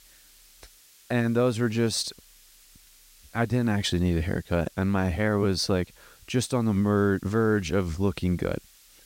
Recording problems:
hiss; faint; throughout; 25 dB below the speech

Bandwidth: 16 kHz